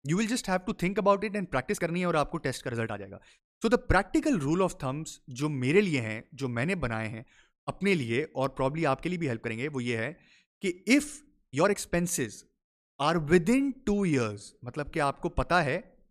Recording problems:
uneven, jittery; strongly; from 1.5 to 15 s

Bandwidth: 14.5 kHz